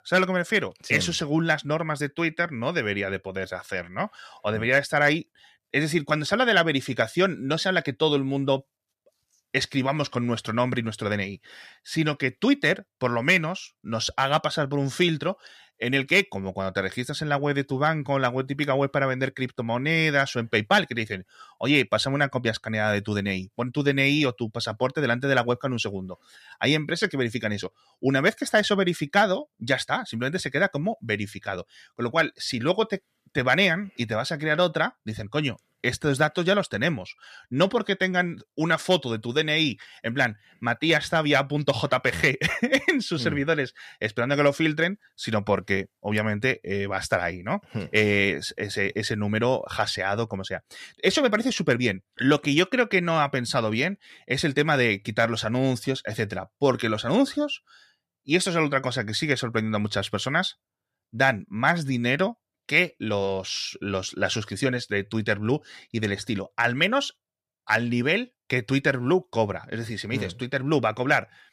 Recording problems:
none

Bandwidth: 14.5 kHz